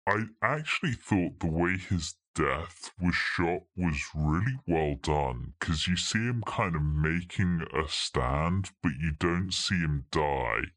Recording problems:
wrong speed and pitch; too slow and too low; 0.7 times normal speed

